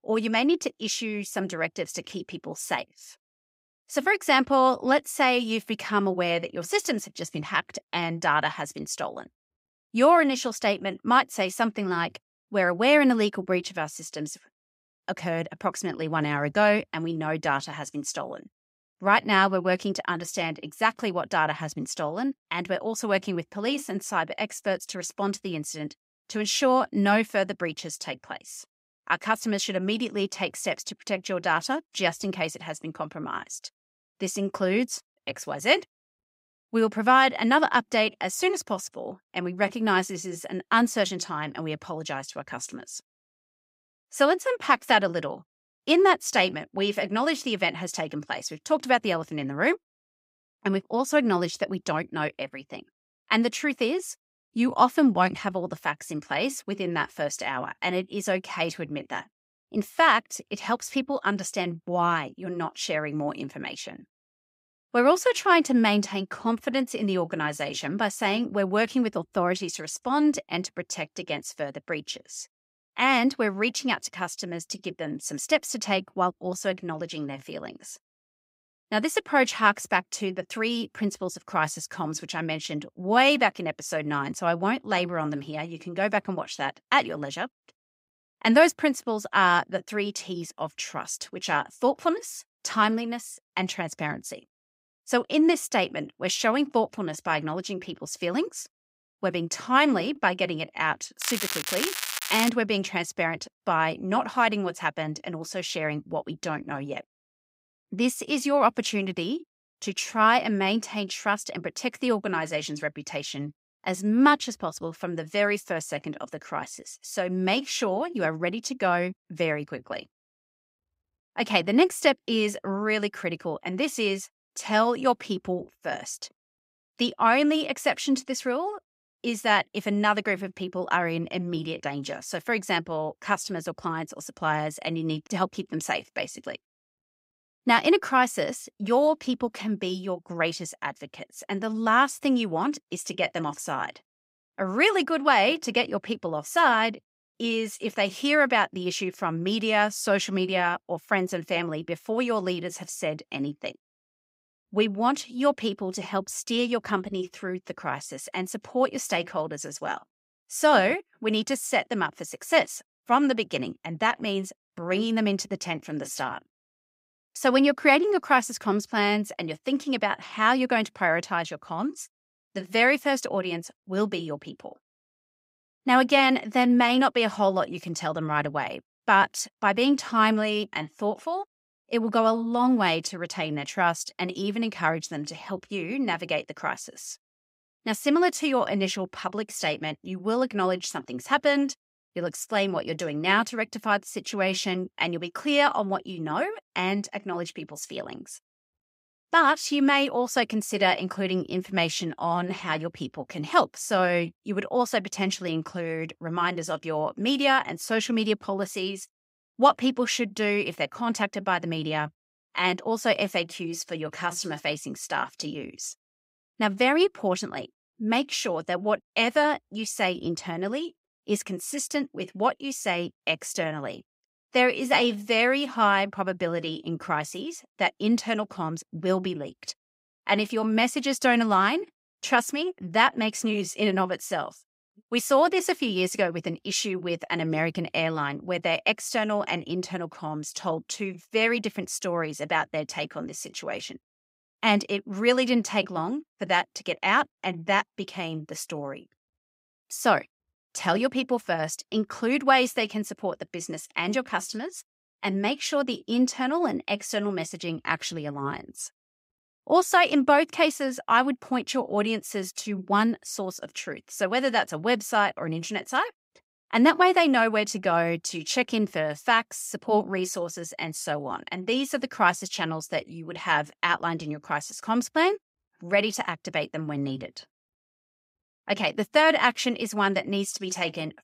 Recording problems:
crackling; loud; from 1:41 to 1:42; 3 dB below the speech

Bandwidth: 15.5 kHz